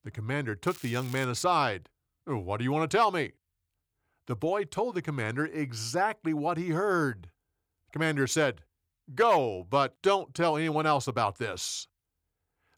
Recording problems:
crackling; noticeable; at 0.5 s; 20 dB below the speech

